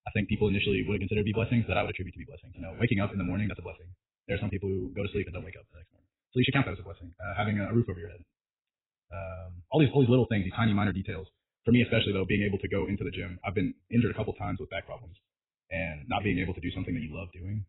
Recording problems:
garbled, watery; badly; nothing above 4 kHz
wrong speed, natural pitch; too fast; 1.7 times normal speed

